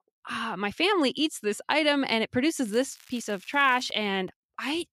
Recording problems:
crackling; faint; from 2.5 to 4 s; 25 dB below the speech

